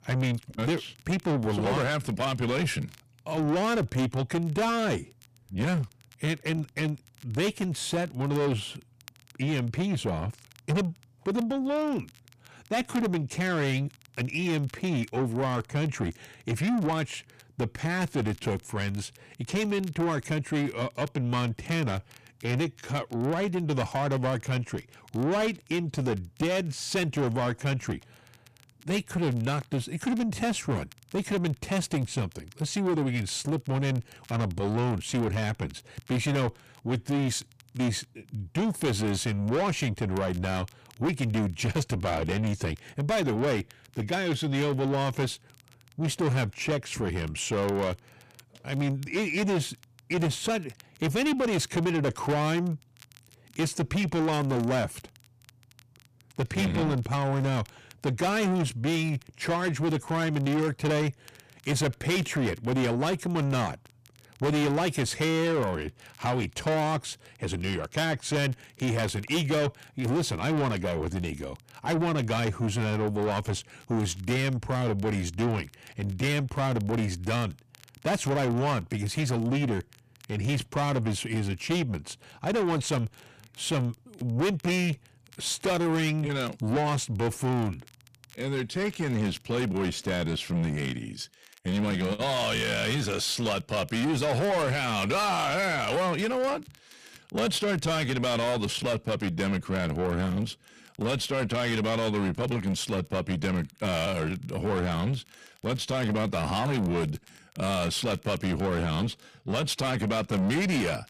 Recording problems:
distortion; heavy; 7 dB below the speech
crackle, like an old record; faint; 25 dB below the speech

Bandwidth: 14.5 kHz